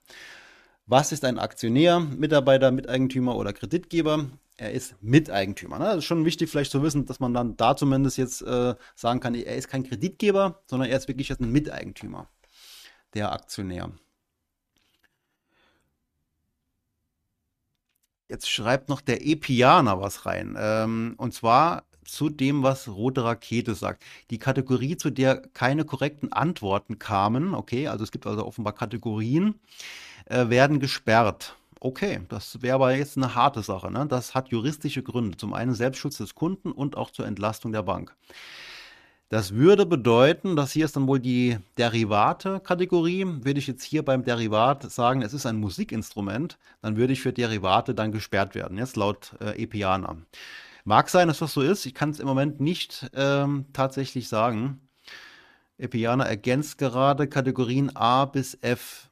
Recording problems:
none

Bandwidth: 14.5 kHz